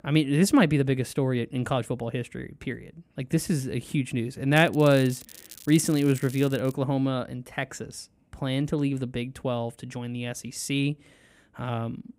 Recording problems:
crackling; noticeable; from 4.5 to 6.5 s; 20 dB below the speech

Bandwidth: 15.5 kHz